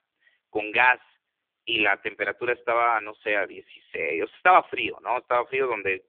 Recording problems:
phone-call audio; poor line

